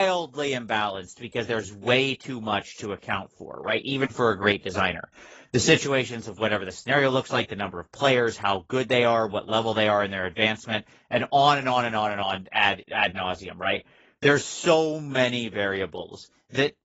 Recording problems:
garbled, watery; badly; nothing above 7.5 kHz
abrupt cut into speech; at the start

